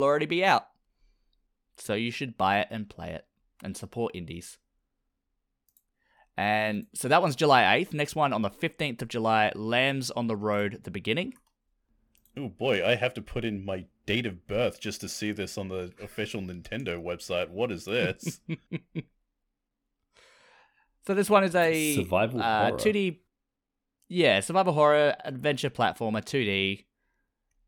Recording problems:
abrupt cut into speech; at the start

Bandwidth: 18 kHz